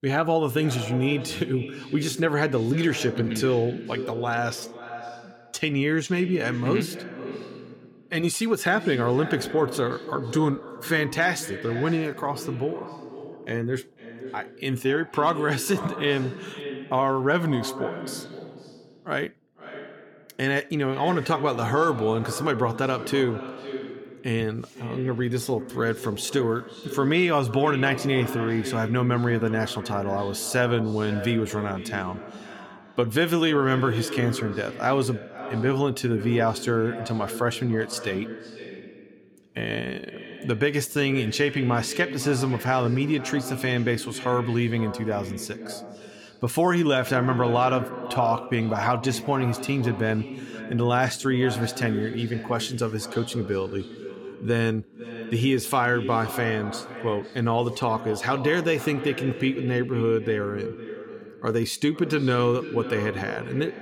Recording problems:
echo of what is said; strong; throughout; 500 ms later, 10 dB below the speech

